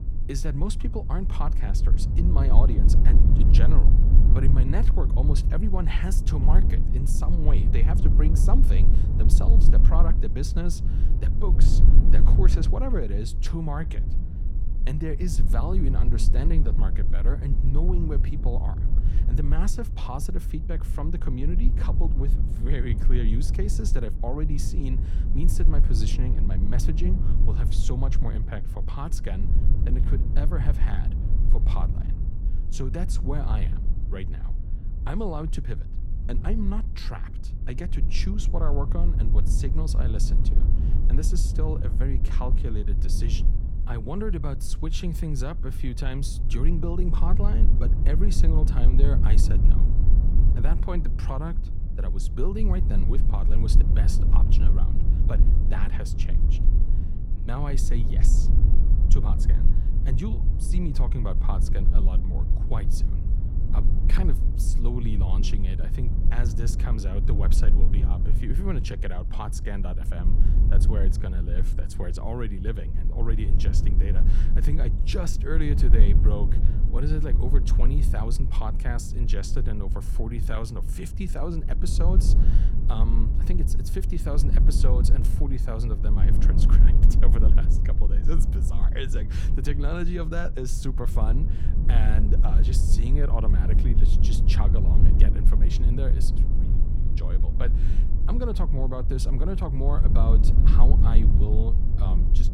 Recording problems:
low rumble; loud; throughout; 5 dB below the speech

